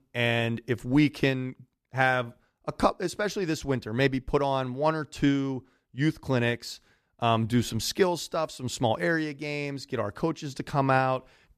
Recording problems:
none

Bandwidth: 14.5 kHz